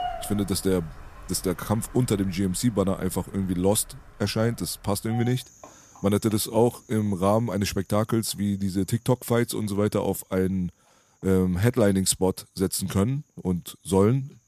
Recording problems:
animal sounds; faint; throughout; 20 dB below the speech

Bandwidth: 14.5 kHz